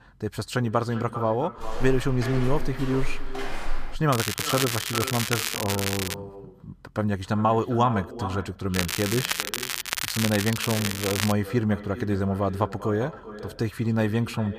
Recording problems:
echo of what is said; noticeable; throughout; 400 ms later, 10 dB below the speech
crackling; loud; from 4 to 6 s and from 8.5 to 11 s; 2 dB below the speech
footsteps; noticeable; from 1.5 to 4 s; peak 8 dB below the speech

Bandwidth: 15 kHz